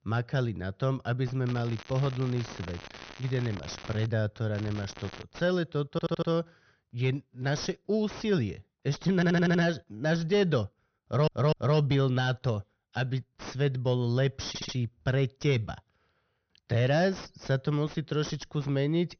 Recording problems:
high frequencies cut off; noticeable; nothing above 6.5 kHz
distortion; slight; 10 dB below the speech
crackling; noticeable; from 1.5 to 4 s and at 4.5 s; 15 dB below the speech
audio stuttering; 4 times, first at 6 s

